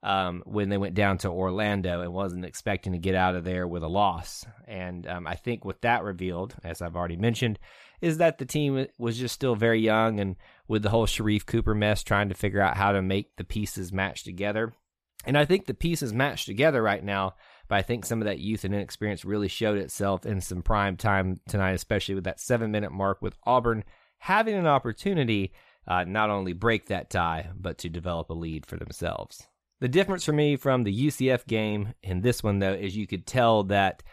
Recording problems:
none

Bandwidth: 14.5 kHz